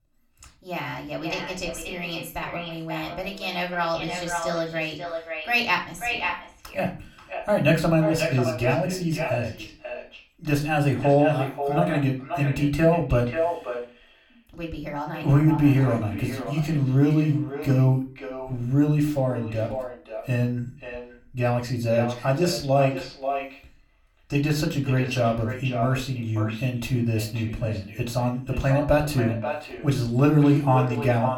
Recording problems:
echo of what is said; strong; throughout; 540 ms later, 9 dB below the speech
room echo; very slight; dies away in 0.3 s
off-mic speech; somewhat distant

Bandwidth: 18 kHz